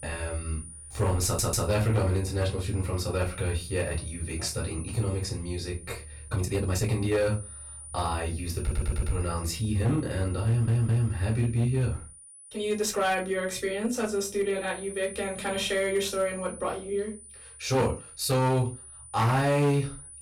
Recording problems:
off-mic speech; far
distortion; slight; 5% of the sound clipped
room echo; very slight; dies away in 0.2 s
high-pitched whine; noticeable; throughout; 9.5 kHz, 15 dB below the speech
audio stuttering; at 1.5 s, at 8.5 s and at 10 s
uneven, jittery; strongly; from 6.5 to 19 s

